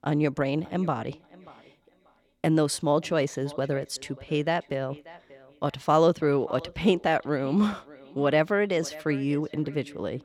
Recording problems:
echo of what is said; faint; throughout; 590 ms later, 20 dB below the speech

